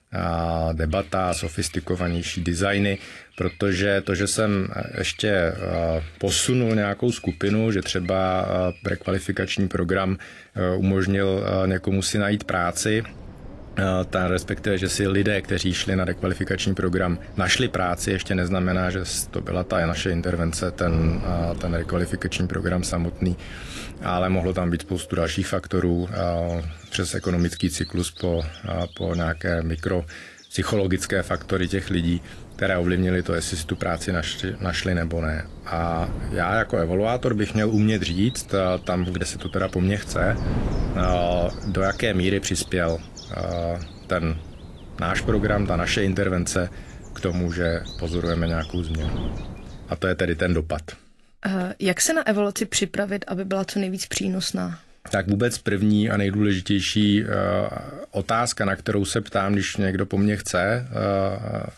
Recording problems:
garbled, watery; slightly; nothing above 11.5 kHz
wind noise on the microphone; occasional gusts; from 13 to 25 s and from 31 to 50 s; 20 dB below the speech
animal sounds; faint; throughout; 20 dB below the speech

